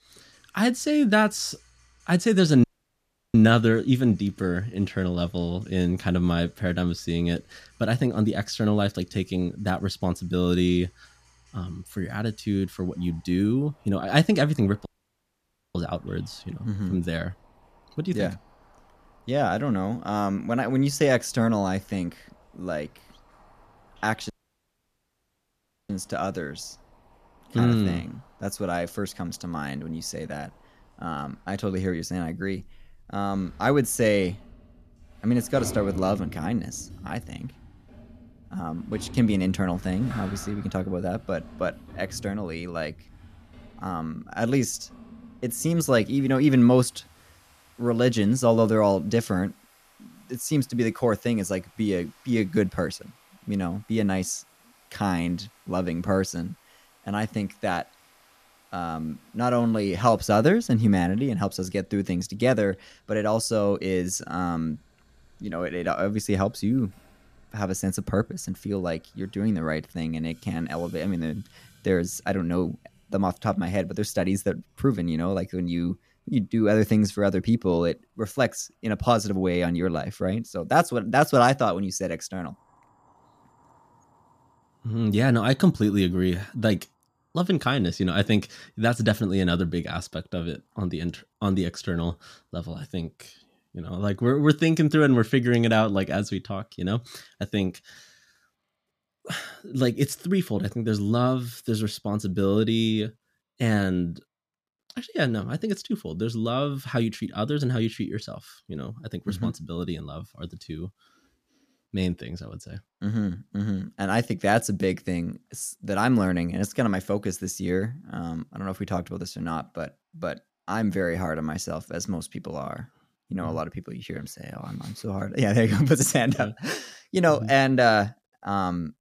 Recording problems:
household noises; faint; throughout; 25 dB below the speech
audio cutting out; at 2.5 s for 0.5 s, at 15 s for 1 s and at 24 s for 1.5 s

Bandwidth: 14.5 kHz